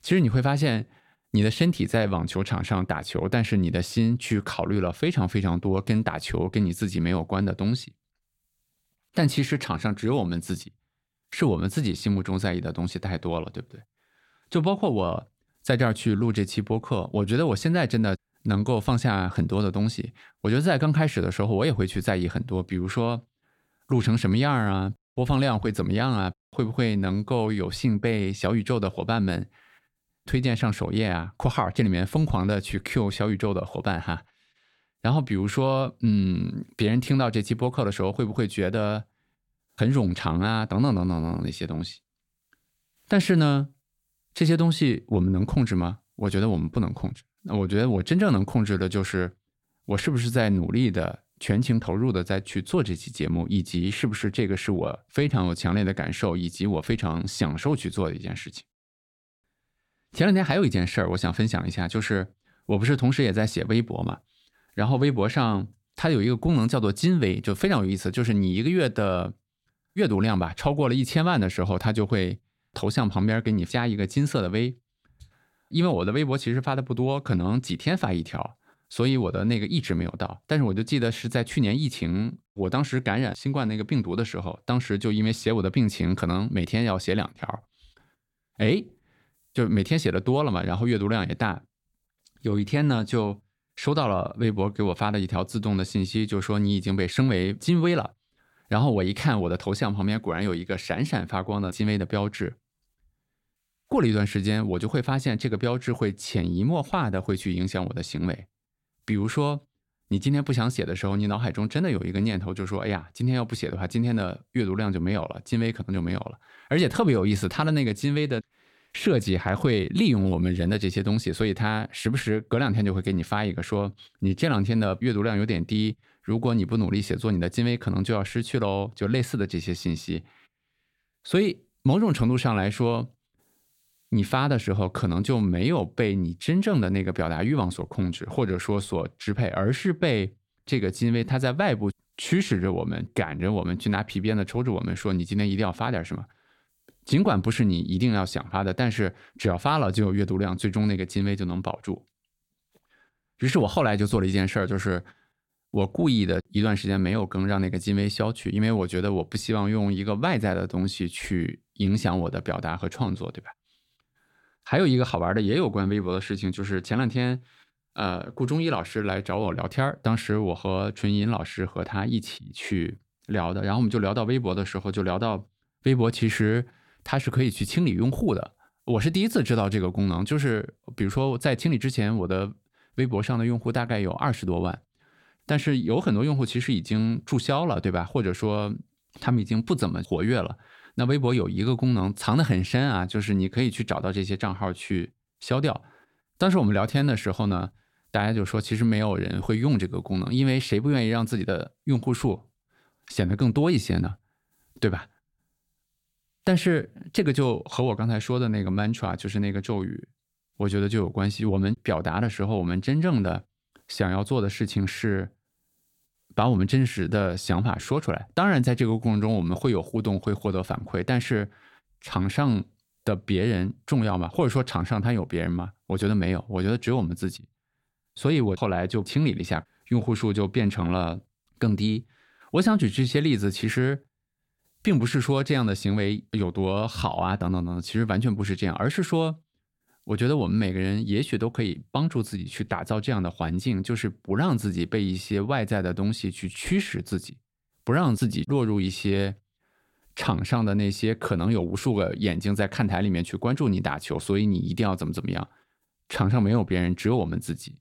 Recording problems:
none

